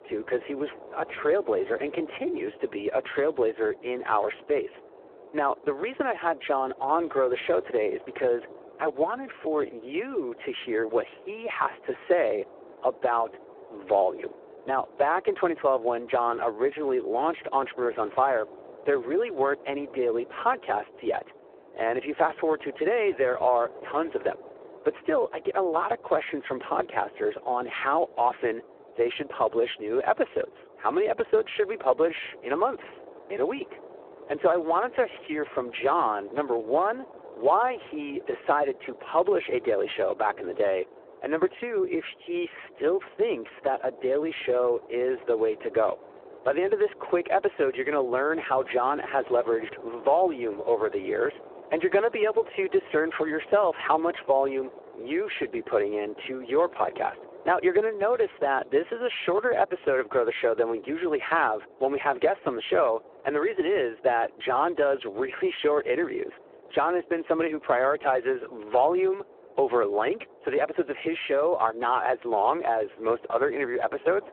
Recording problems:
phone-call audio; poor line
wind noise on the microphone; occasional gusts; 20 dB below the speech

